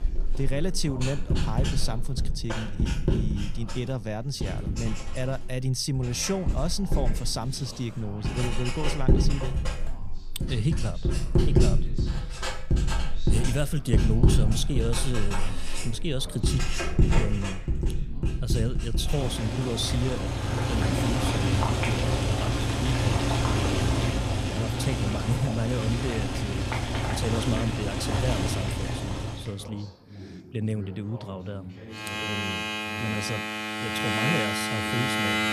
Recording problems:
household noises; very loud; throughout; 3 dB above the speech
background chatter; noticeable; throughout; 3 voices, 15 dB below the speech

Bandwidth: 14.5 kHz